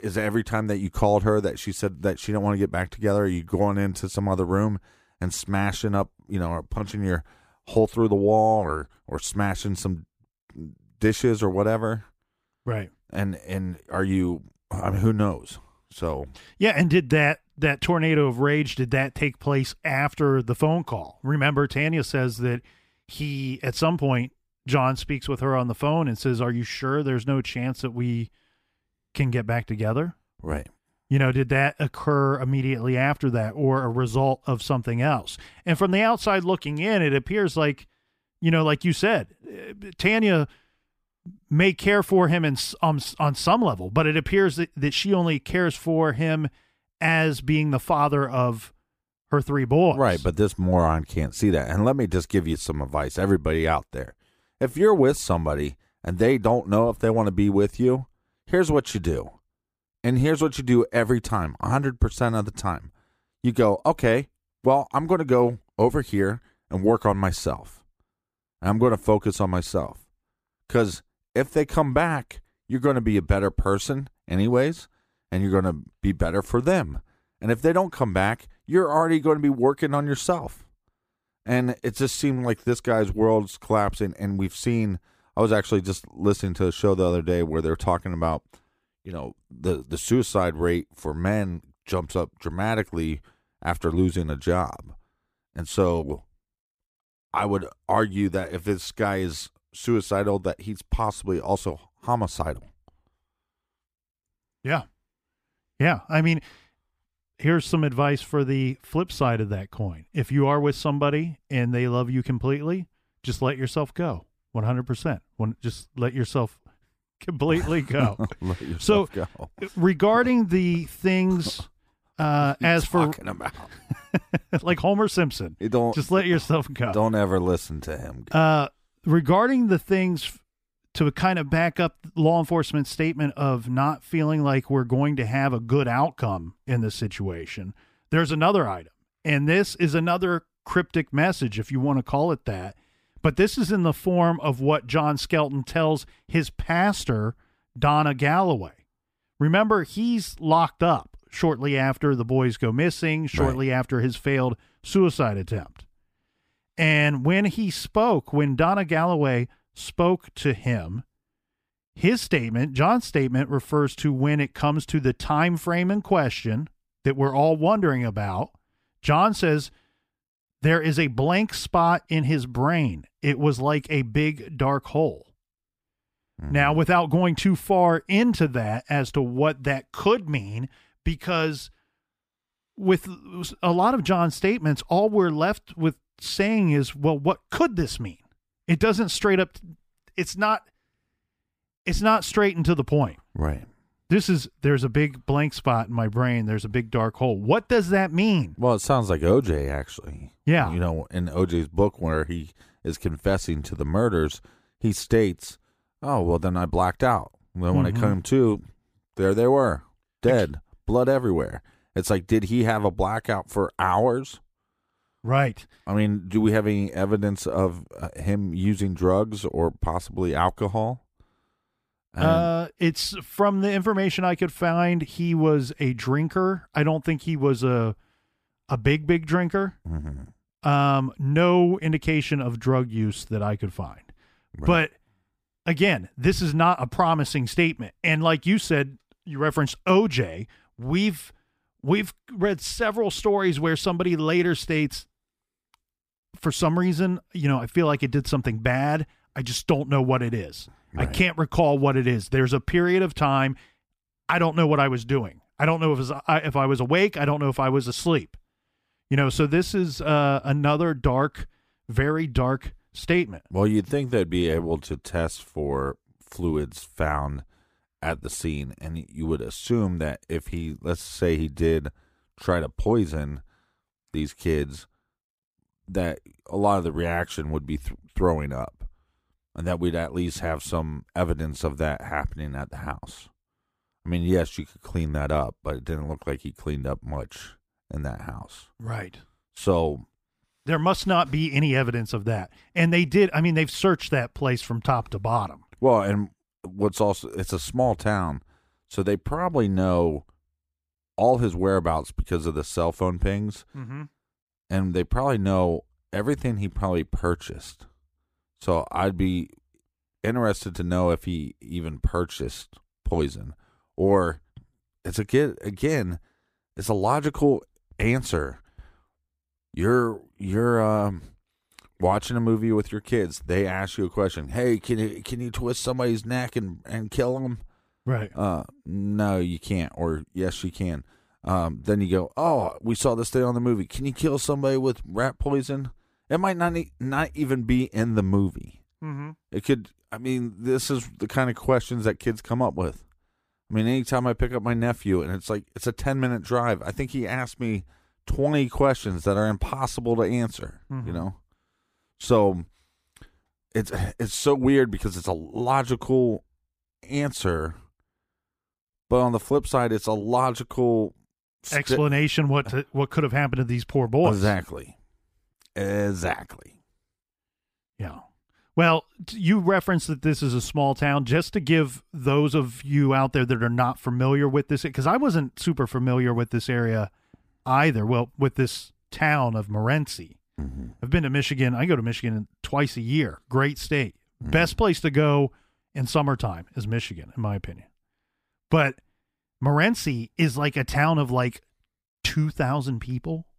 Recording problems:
none

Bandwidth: 15 kHz